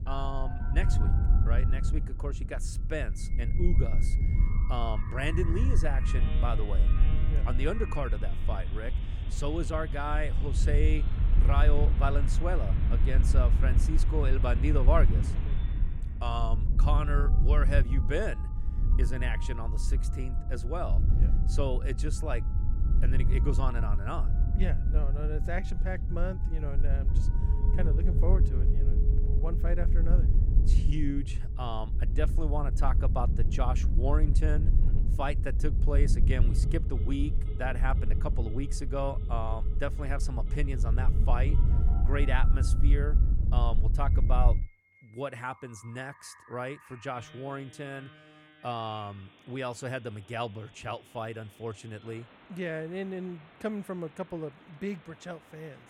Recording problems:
wind noise on the microphone; heavy; until 45 s; 10 dB below the speech
alarms or sirens; noticeable; throughout; 15 dB below the speech

